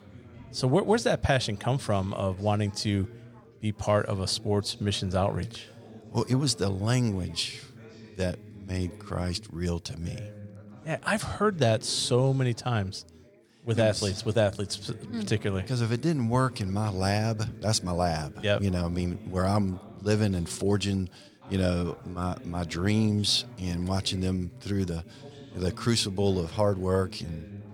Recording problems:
background chatter; noticeable; throughout; 4 voices, 20 dB below the speech

